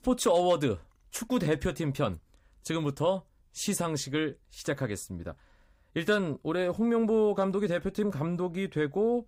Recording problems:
none

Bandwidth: 15.5 kHz